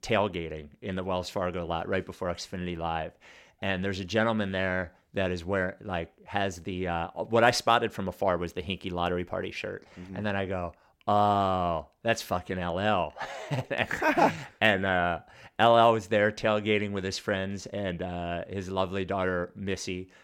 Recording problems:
none

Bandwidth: 16.5 kHz